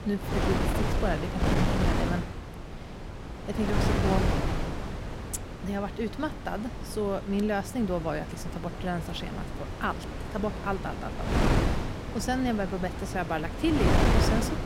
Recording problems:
wind noise on the microphone; heavy; as loud as the speech

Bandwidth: 16 kHz